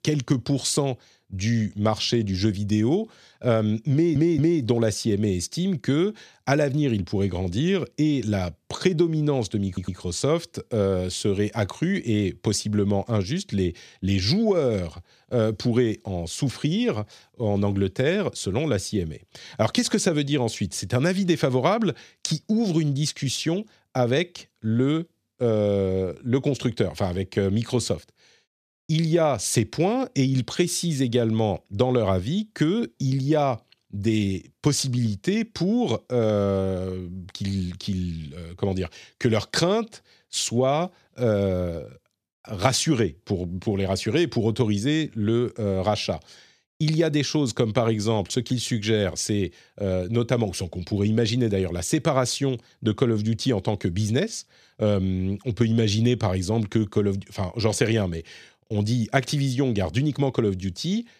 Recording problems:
audio stuttering; at 4 s and at 9.5 s

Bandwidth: 14.5 kHz